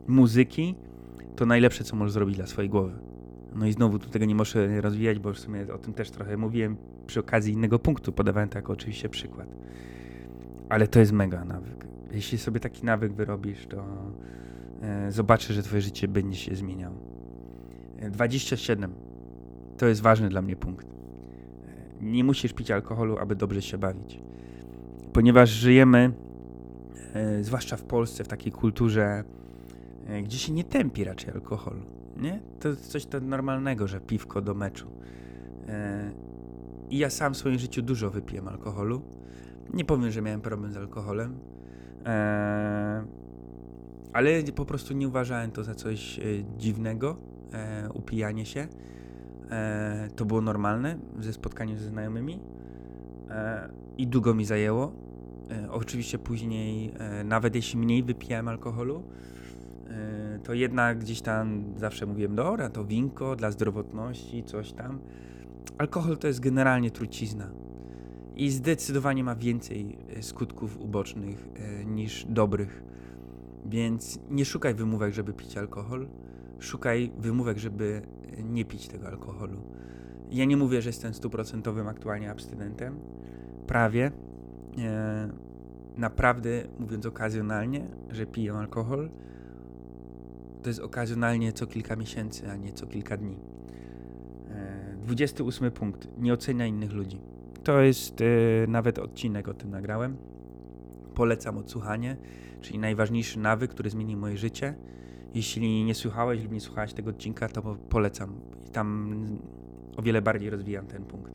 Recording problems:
electrical hum; noticeable; throughout; 60 Hz, 20 dB below the speech

